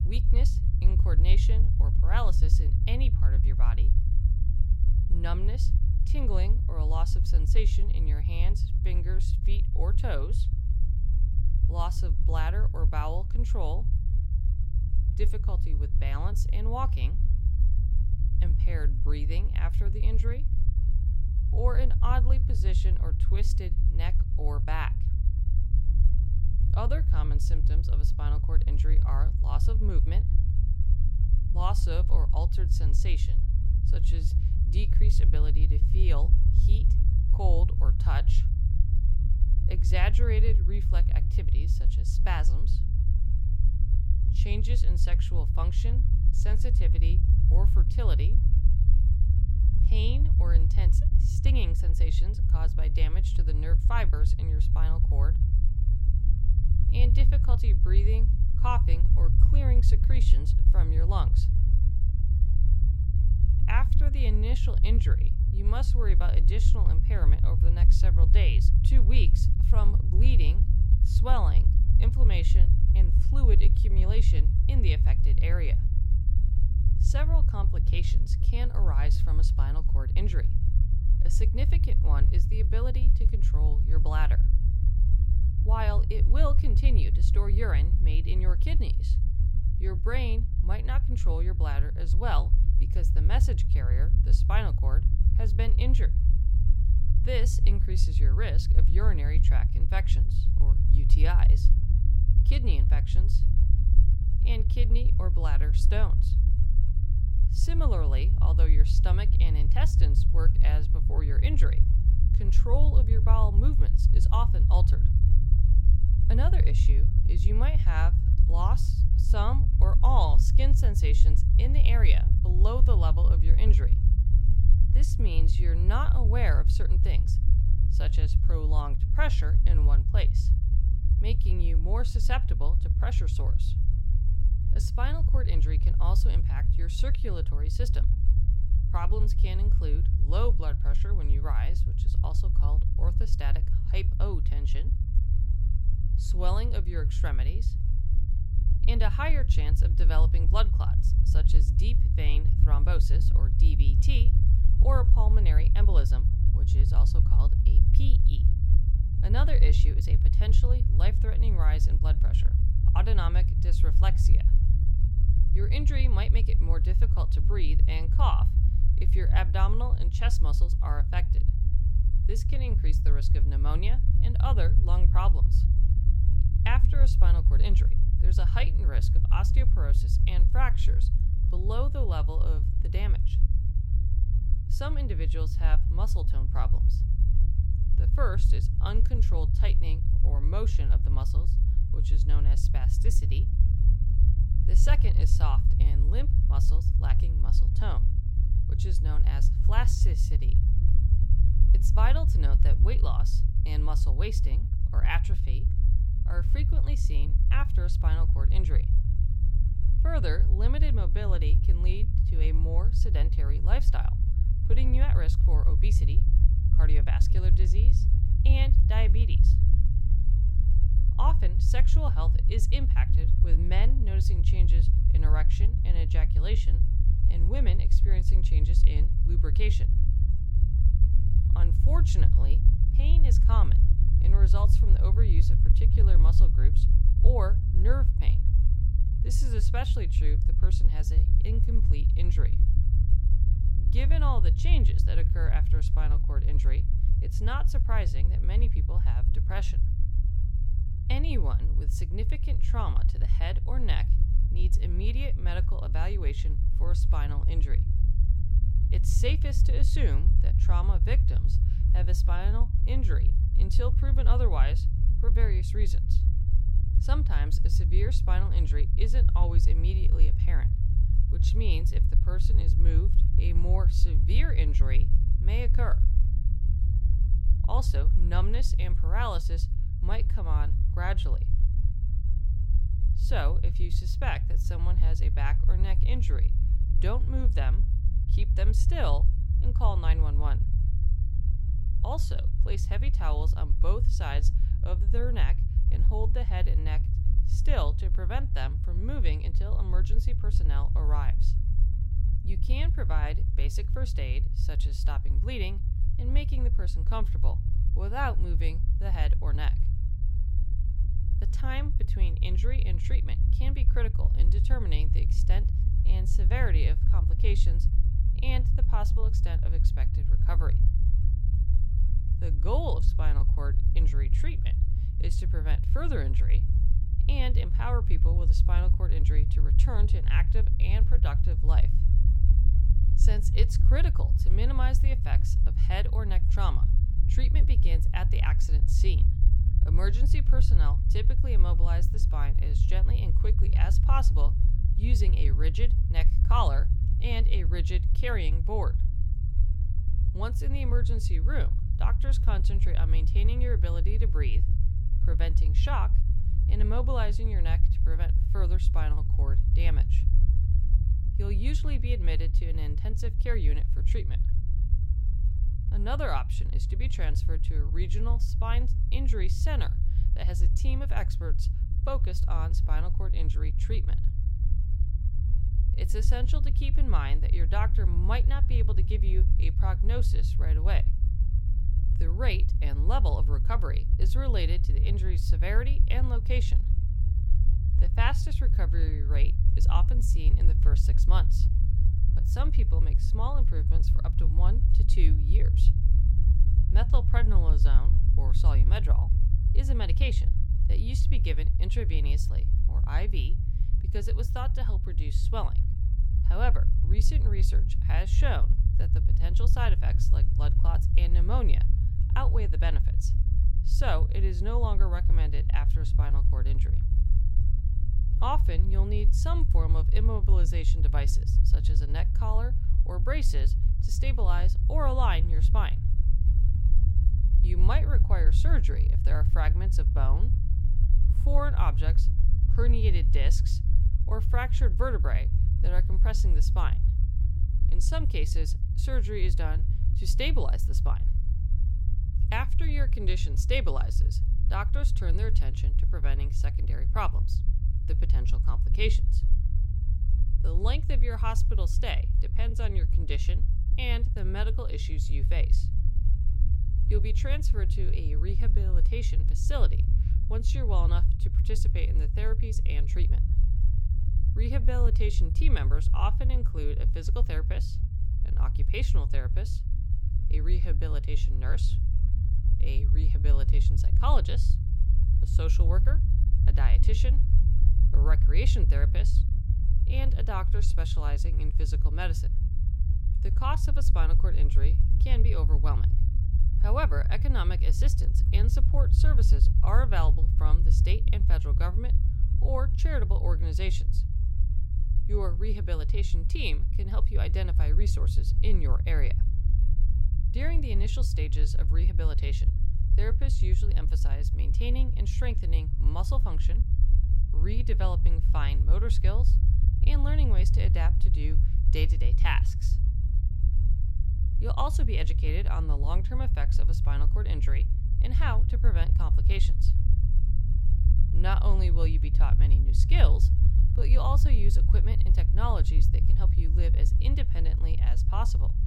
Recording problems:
low rumble; loud; throughout; 6 dB below the speech

